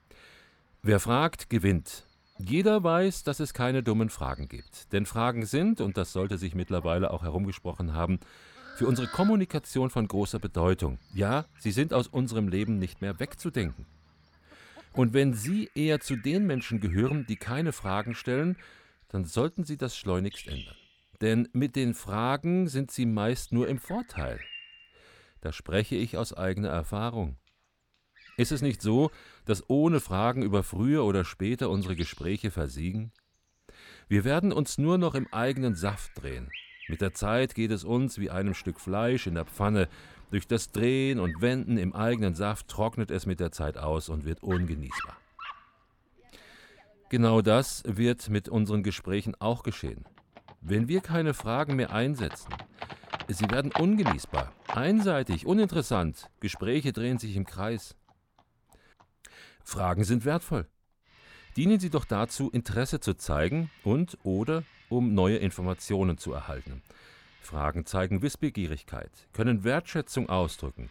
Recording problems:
animal sounds; noticeable; throughout; 15 dB below the speech

